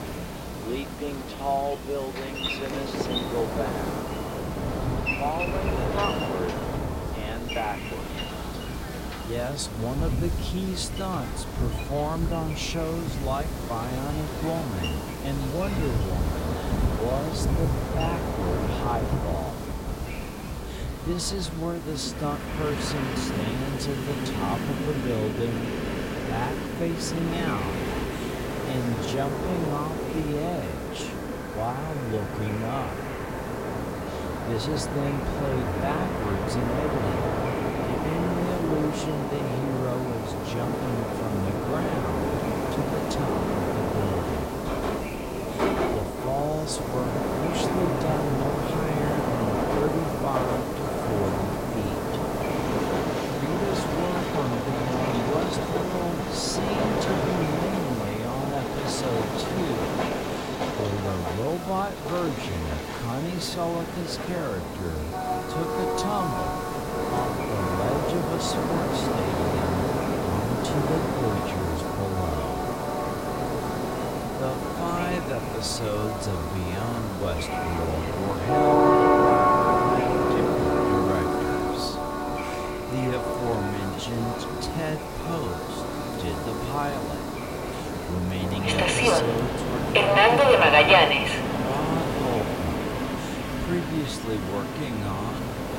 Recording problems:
wrong speed, natural pitch; too slow; 0.6 times normal speed
train or aircraft noise; very loud; throughout; 4 dB above the speech
hiss; loud; throughout; 8 dB below the speech
murmuring crowd; noticeable; throughout; 15 dB below the speech
wind noise on the microphone; occasional gusts; 15 dB below the speech

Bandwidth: 16 kHz